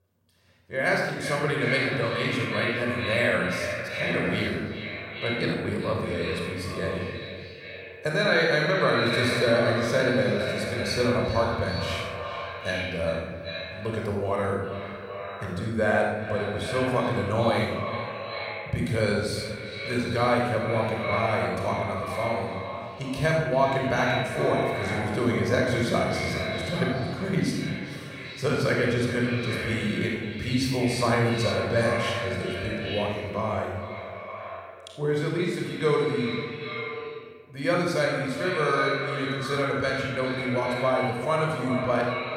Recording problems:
echo of what is said; strong; throughout; 390 ms later, 6 dB below the speech
room echo; noticeable; dies away in 1.1 s
off-mic speech; somewhat distant

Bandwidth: 16 kHz